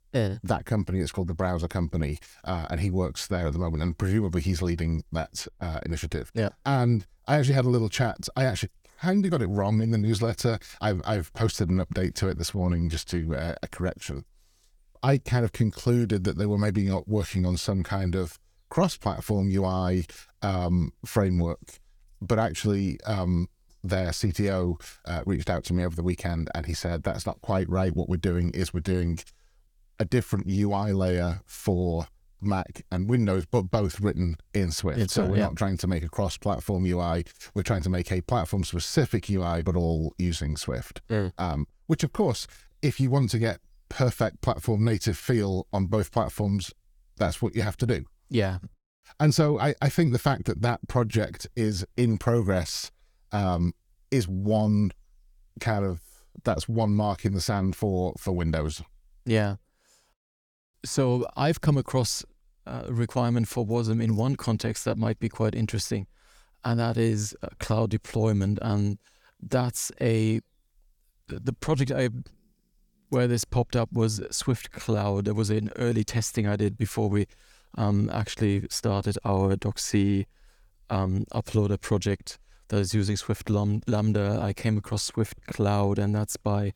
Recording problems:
none

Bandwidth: 19 kHz